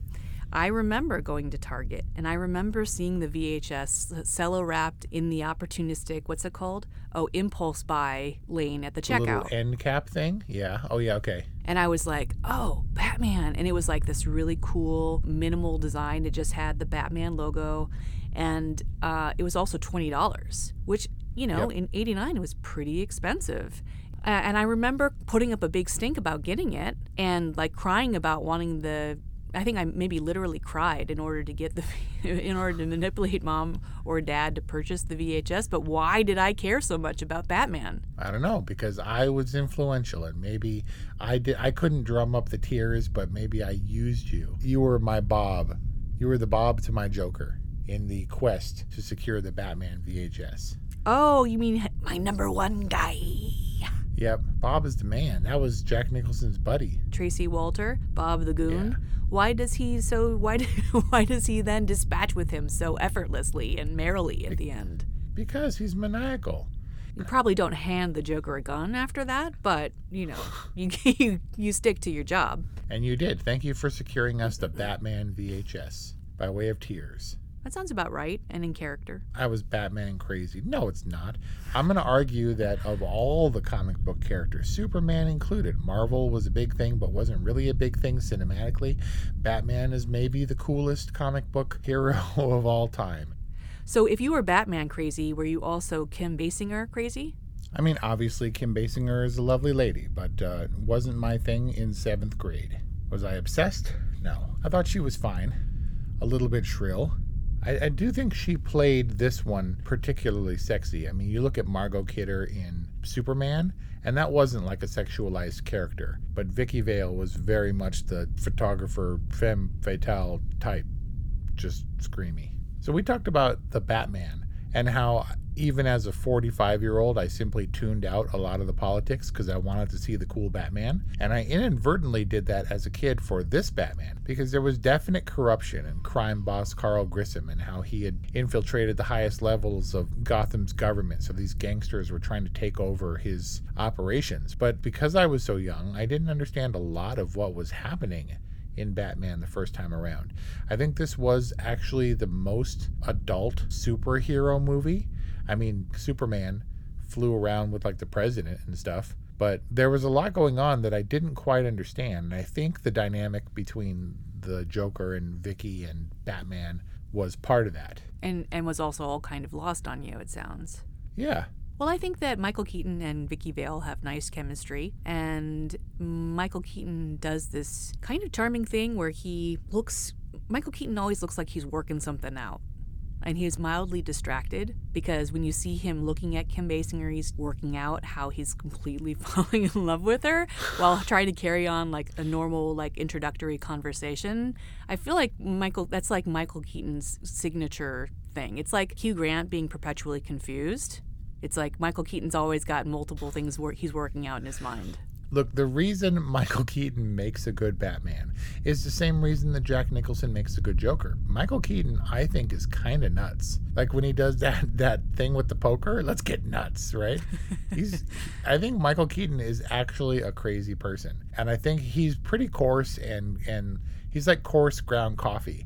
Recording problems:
low rumble; faint; throughout; 25 dB below the speech

